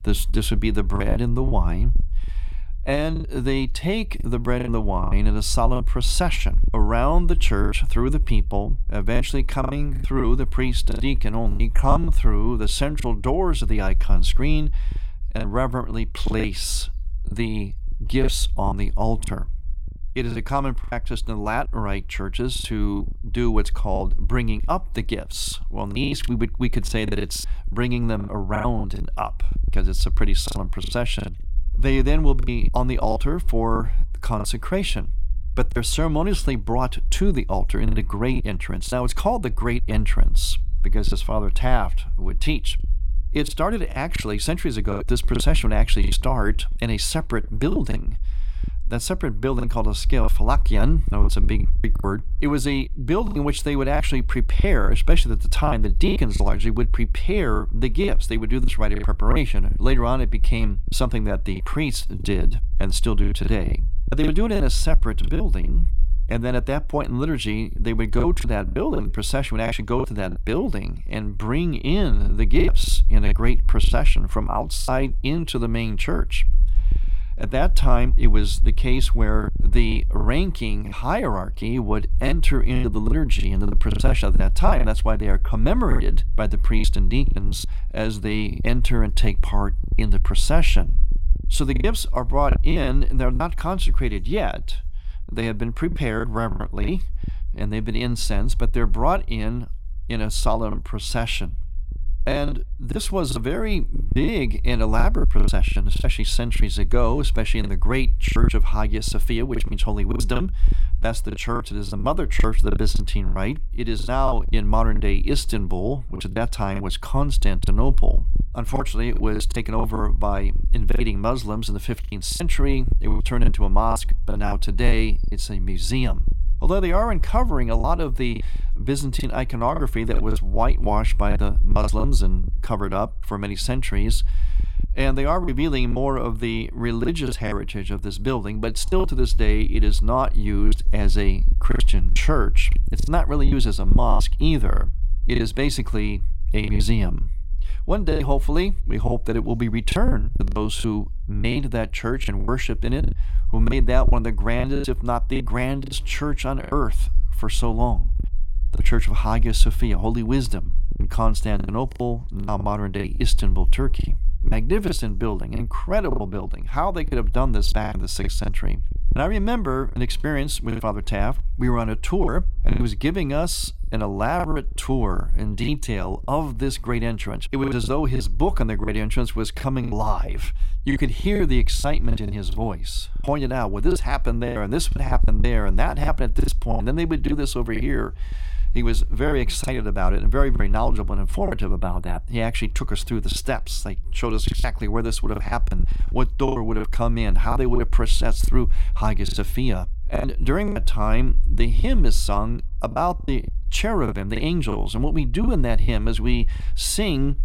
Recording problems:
low rumble; faint; throughout; 20 dB below the speech
choppy; very; 9% of the speech affected

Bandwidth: 16.5 kHz